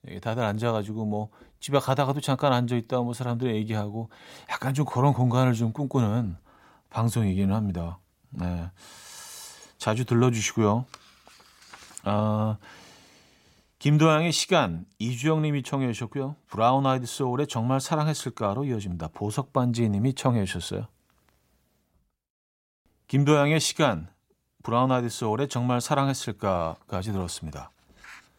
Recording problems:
none

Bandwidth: 16 kHz